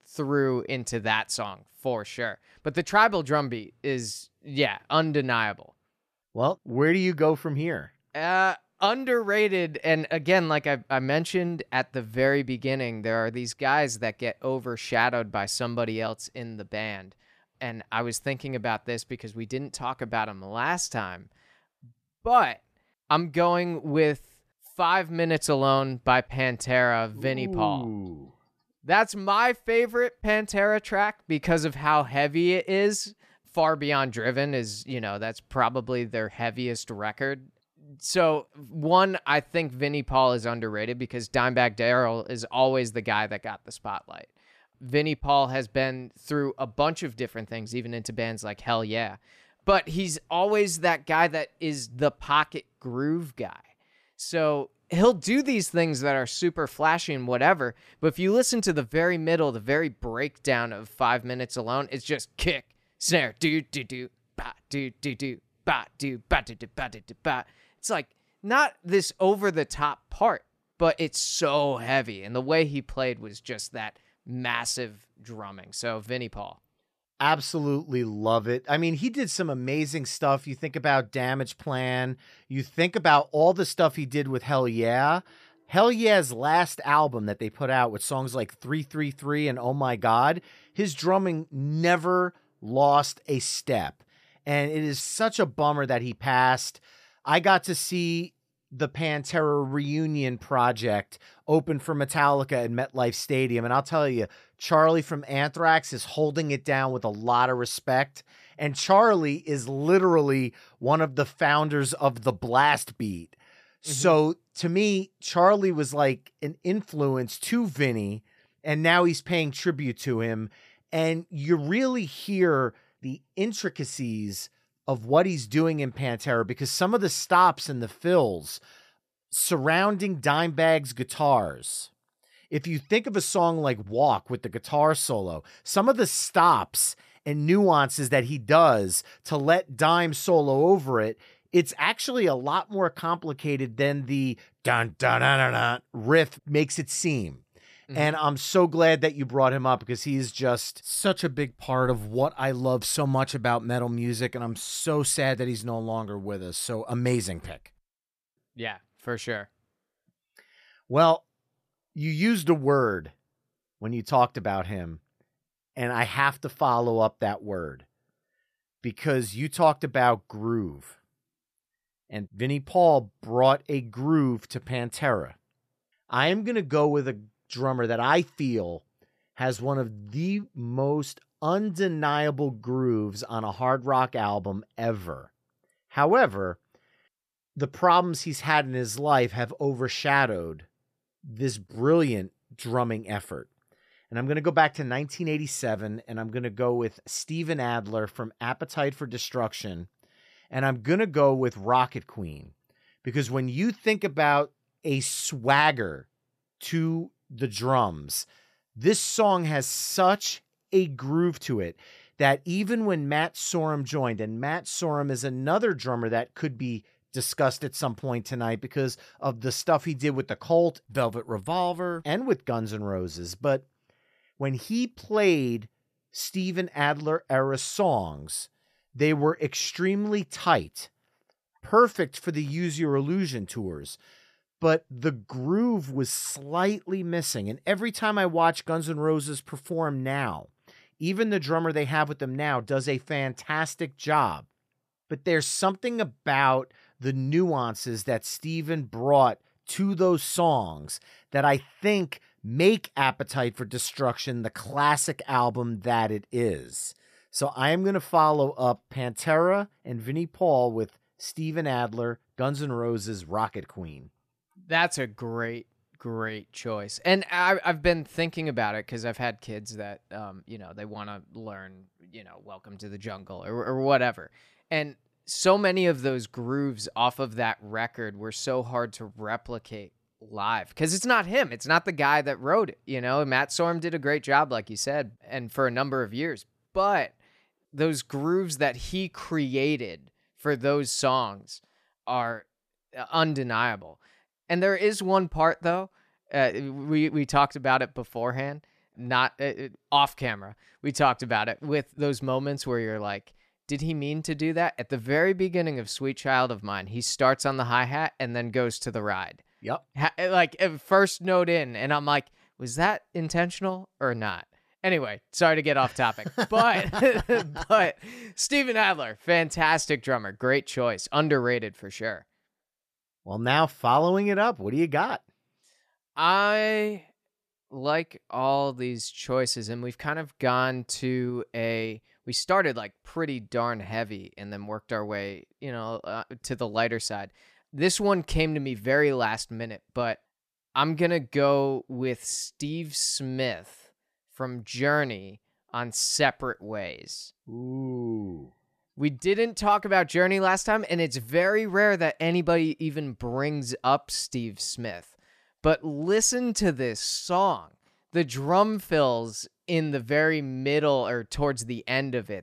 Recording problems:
none

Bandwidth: 14.5 kHz